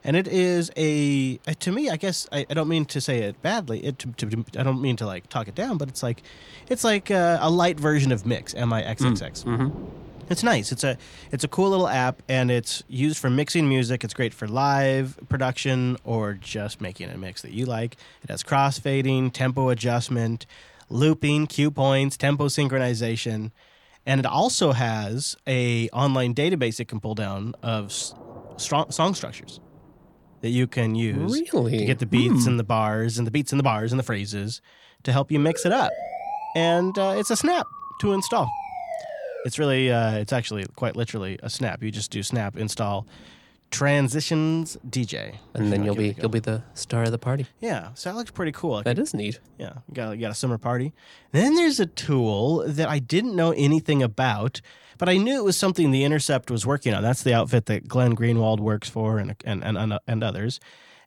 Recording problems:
rain or running water; faint; throughout; 25 dB below the speech
siren; noticeable; from 35 to 39 s; peak 7 dB below the speech

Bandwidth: 18.5 kHz